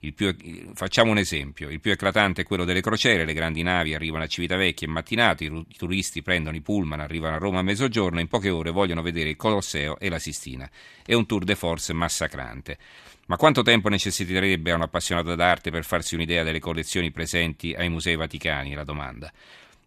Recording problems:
none

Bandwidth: 14 kHz